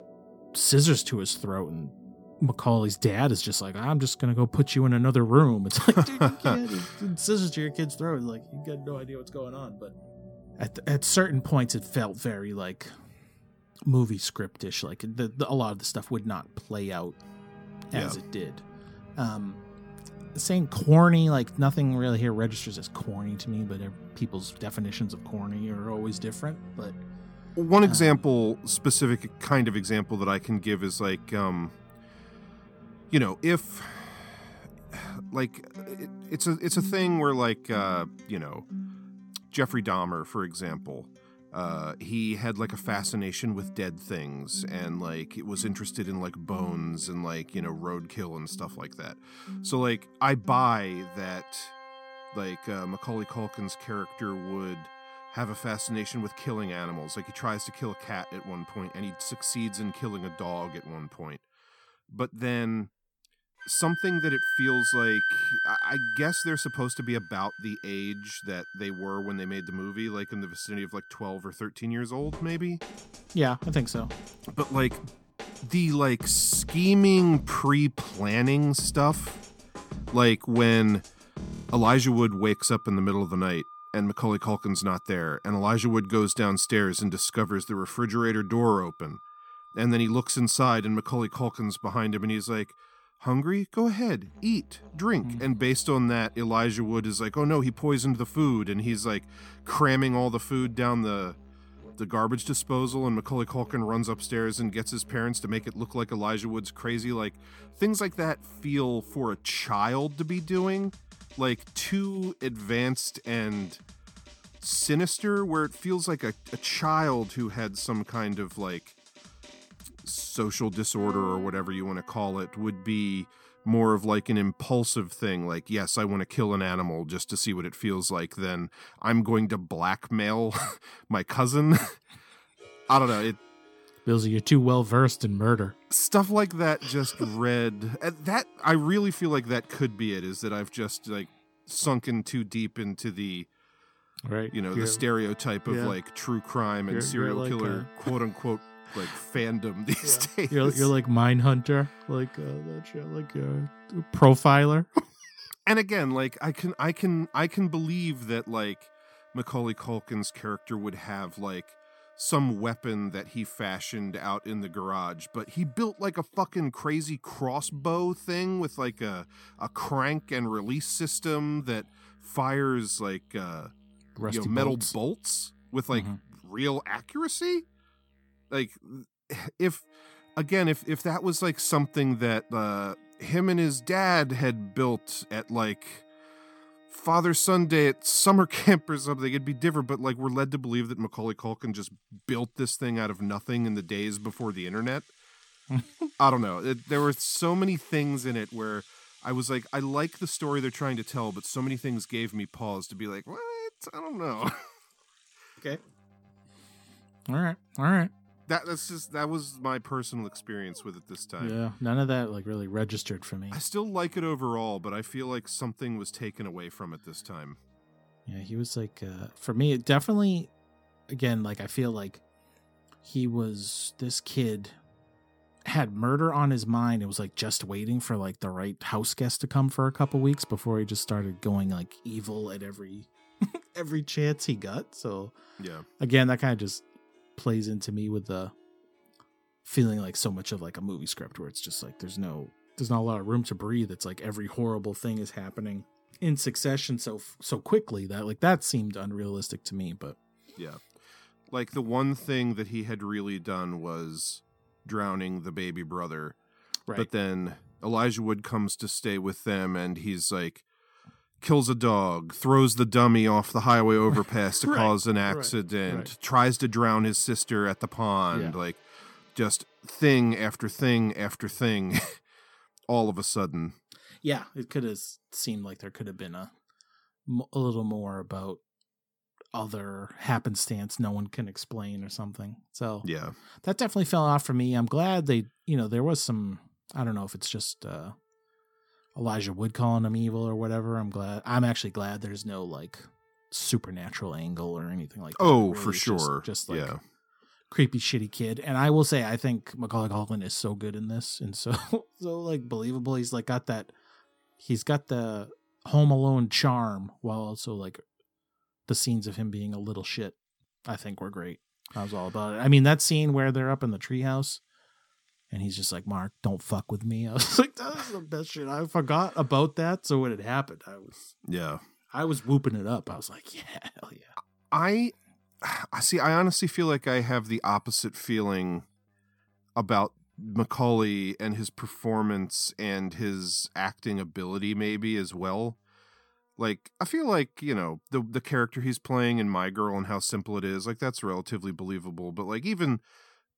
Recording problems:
background music; noticeable; throughout; 15 dB below the speech

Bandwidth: 18 kHz